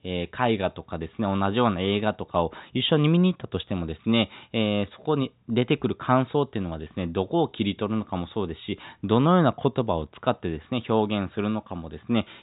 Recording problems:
high frequencies cut off; severe; nothing above 4 kHz
muffled; very slightly; fading above 4 kHz

